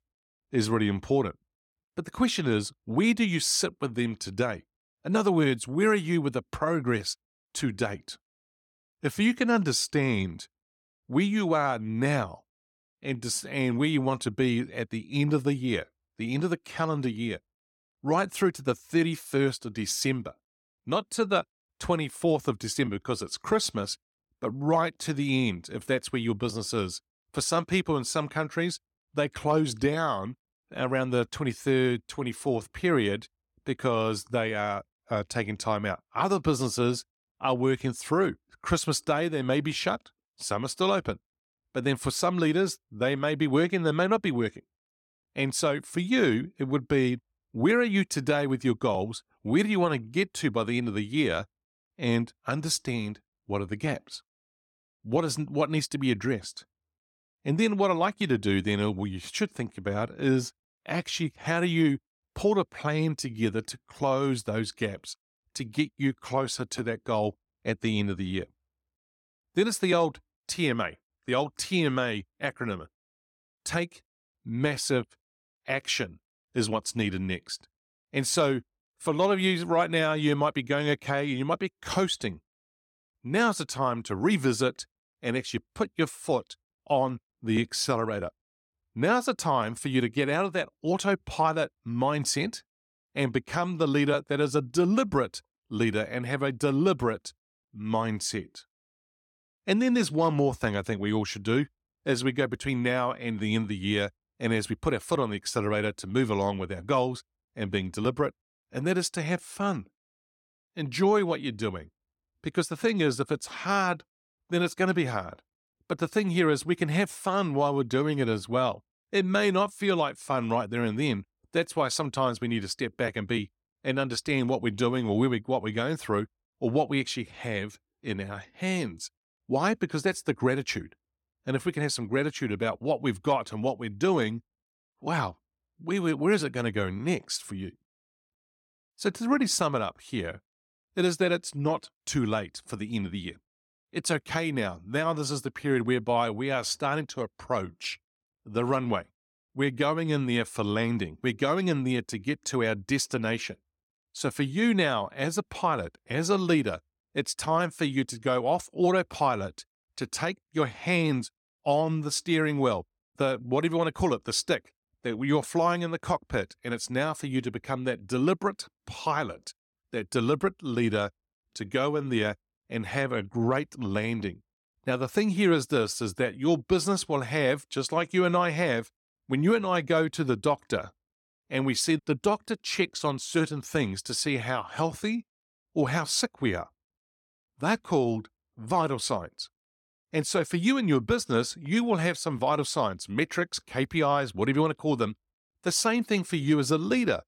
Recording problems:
none

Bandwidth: 17 kHz